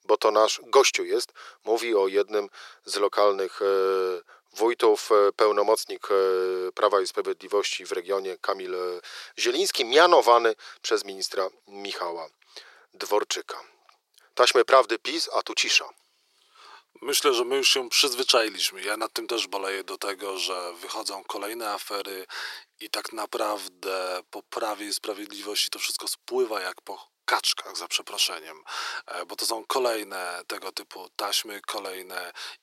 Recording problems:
thin; very; fading below 350 Hz

